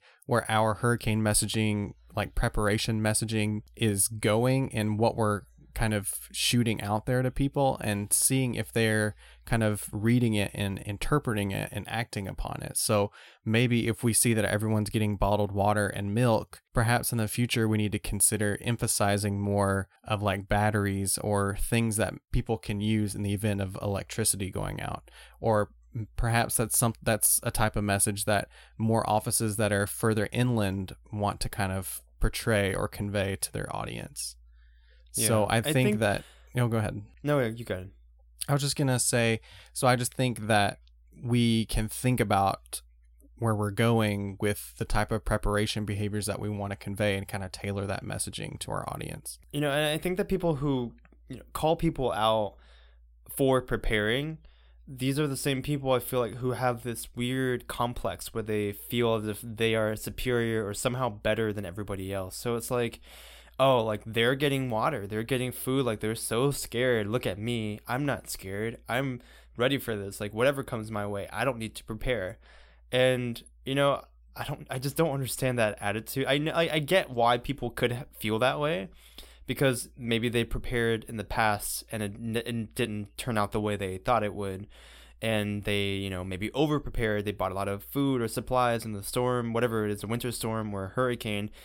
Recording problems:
none

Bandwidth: 16.5 kHz